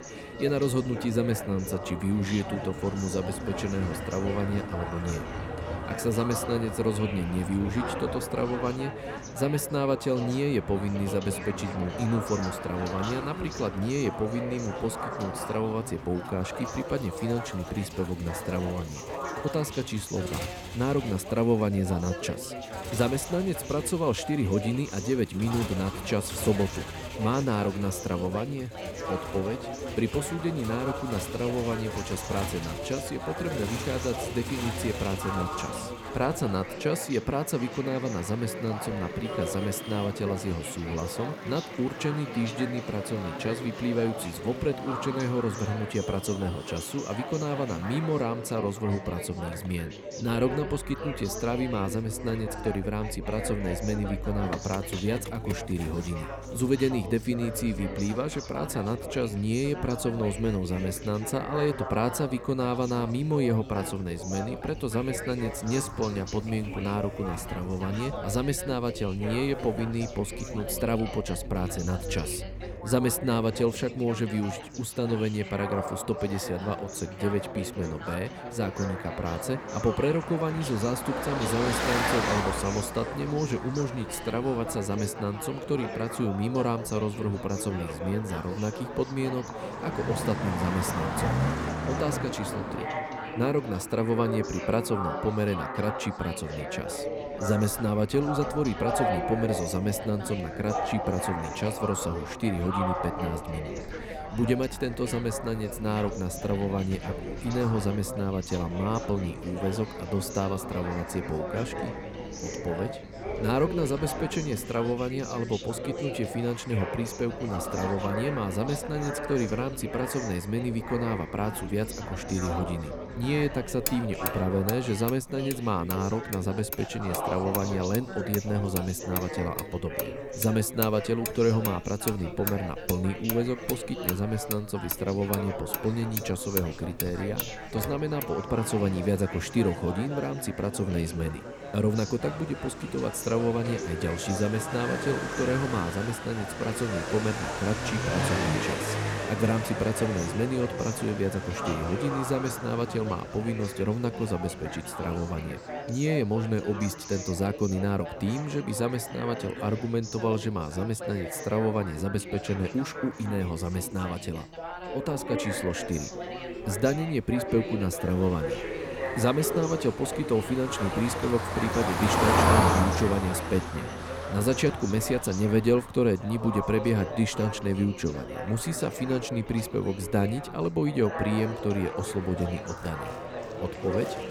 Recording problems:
traffic noise; loud; throughout; 8 dB below the speech
background chatter; loud; throughout; 4 voices, 8 dB below the speech

